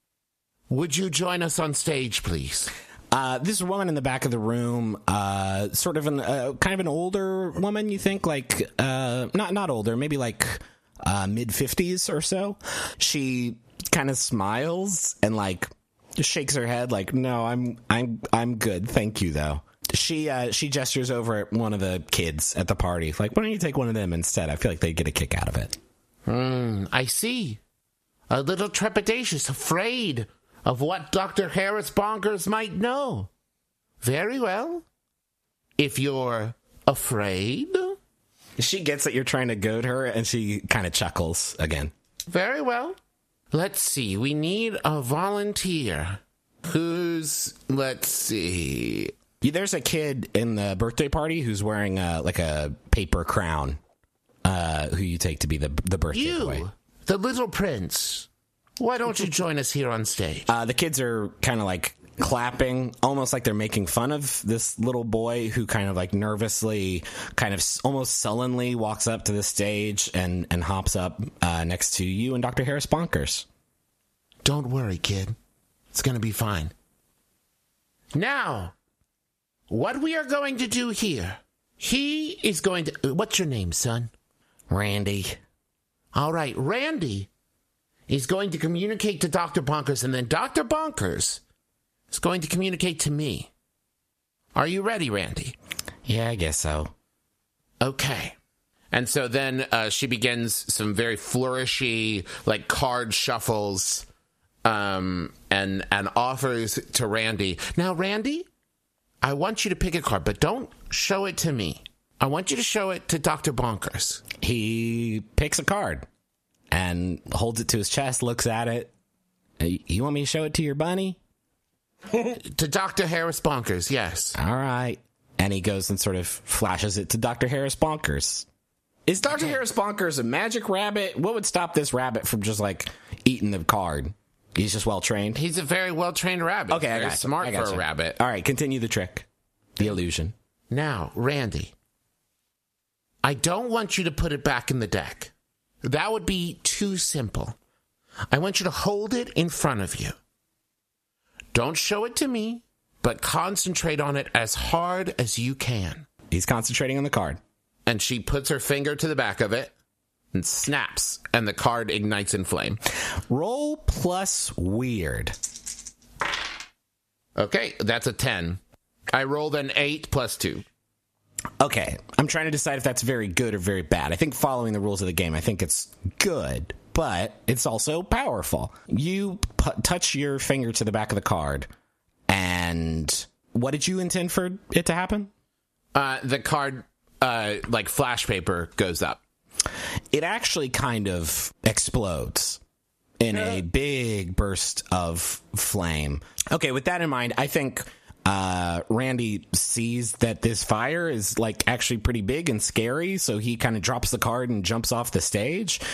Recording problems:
squashed, flat; heavily

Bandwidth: 14.5 kHz